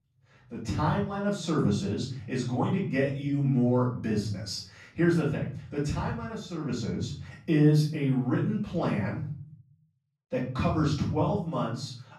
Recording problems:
off-mic speech; far
room echo; noticeable; dies away in 0.5 s

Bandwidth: 13.5 kHz